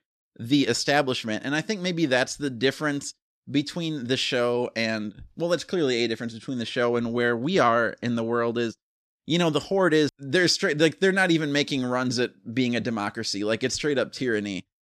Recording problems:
none

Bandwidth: 14 kHz